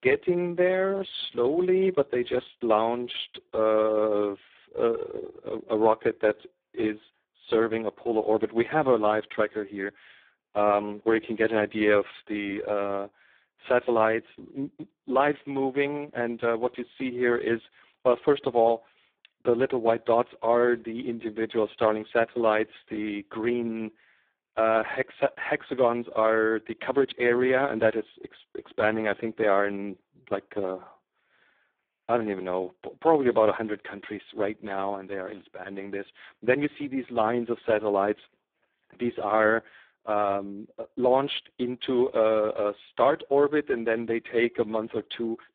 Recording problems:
phone-call audio; poor line; nothing above 3.5 kHz

